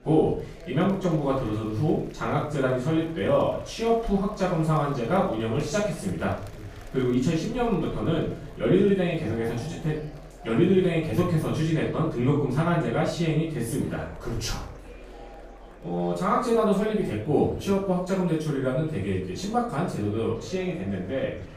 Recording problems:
off-mic speech; far
room echo; noticeable; dies away in 0.5 s
murmuring crowd; faint; throughout; 20 dB below the speech

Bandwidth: 15 kHz